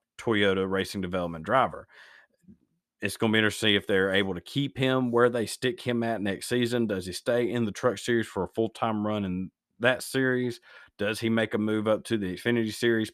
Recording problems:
none

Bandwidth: 14.5 kHz